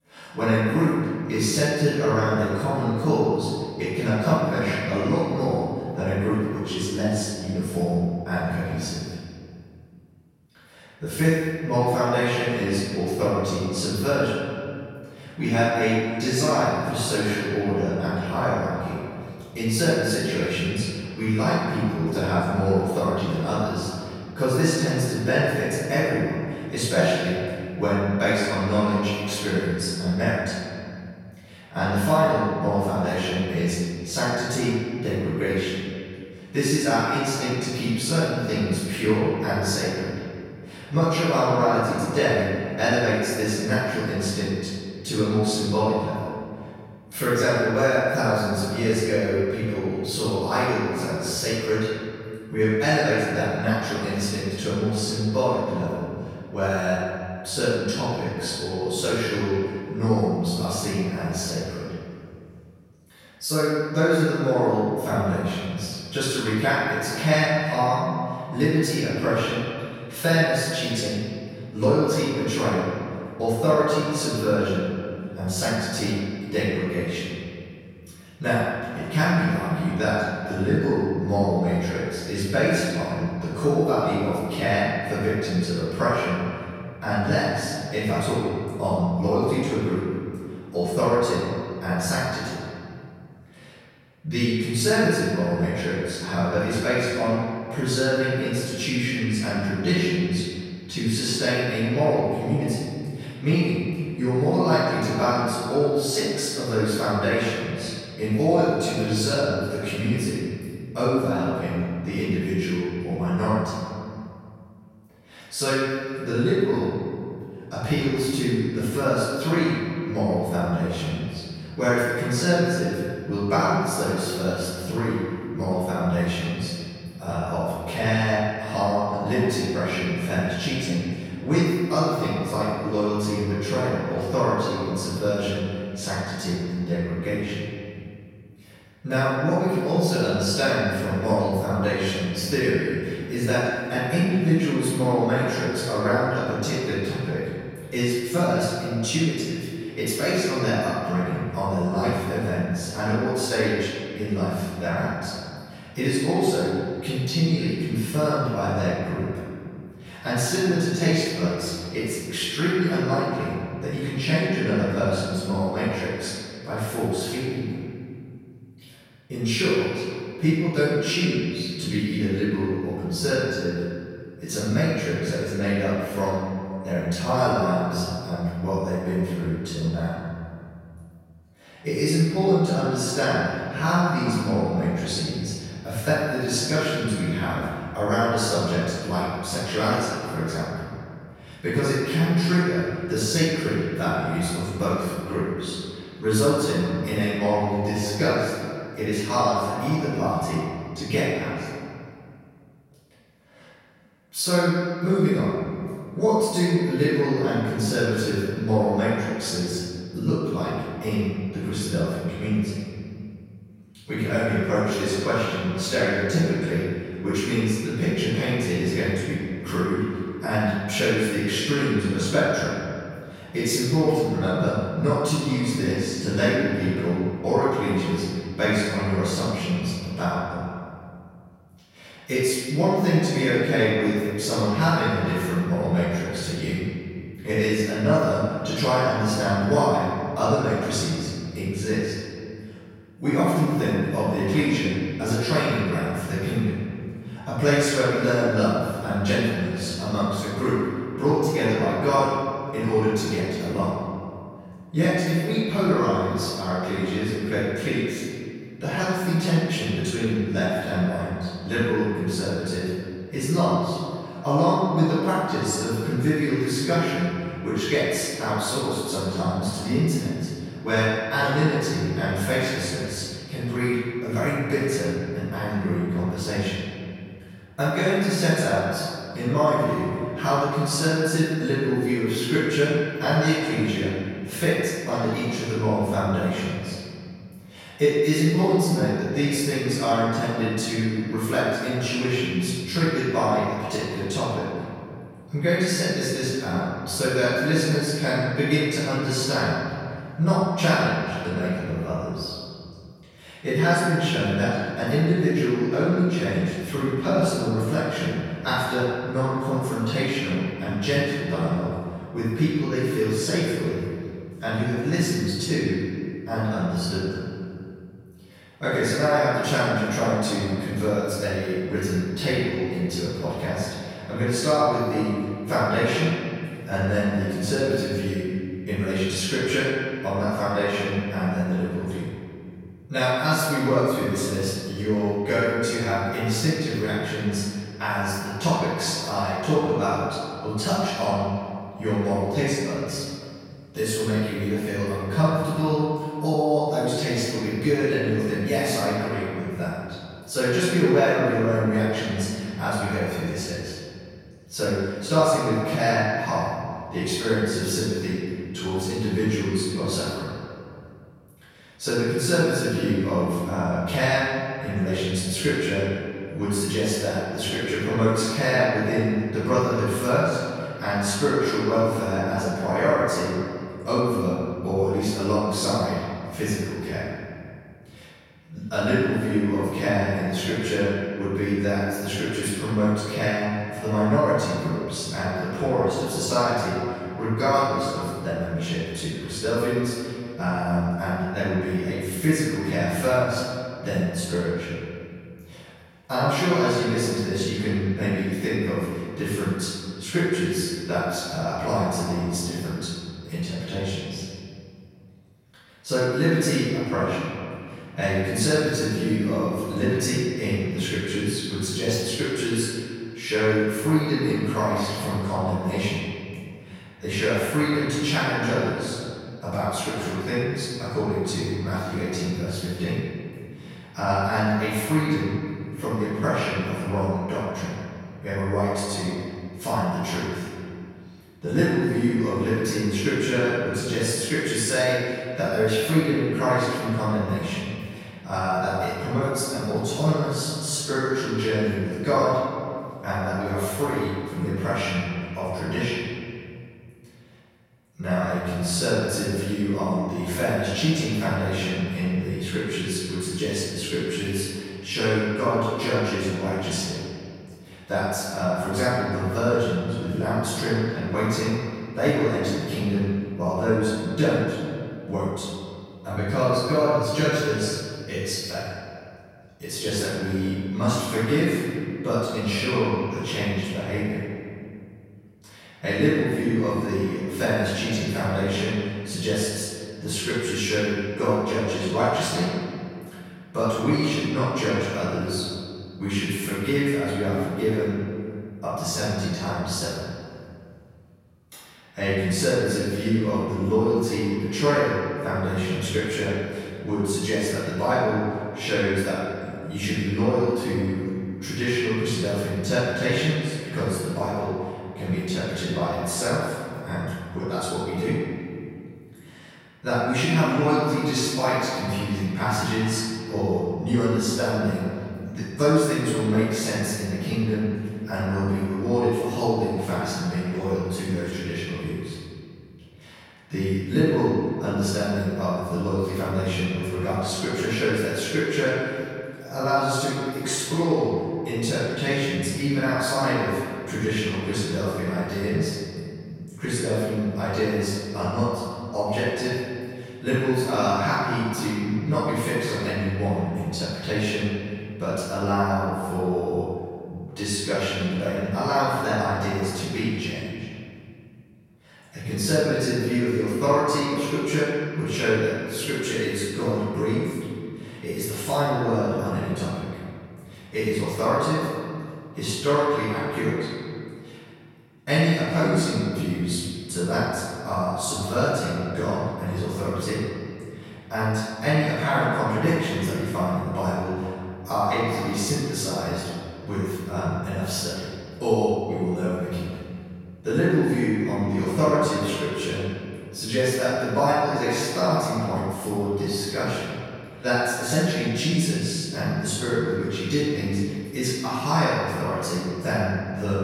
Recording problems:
room echo; strong; dies away in 2.2 s
off-mic speech; far

